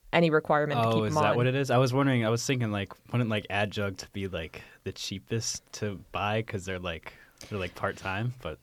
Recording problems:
none

